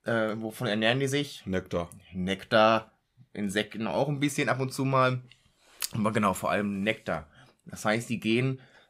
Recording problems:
none

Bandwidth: 15.5 kHz